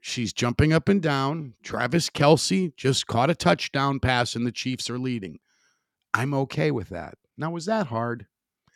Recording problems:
none

